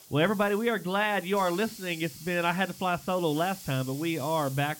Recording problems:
high frequencies cut off; noticeable; nothing above 5.5 kHz
hiss; noticeable; throughout; 15 dB below the speech

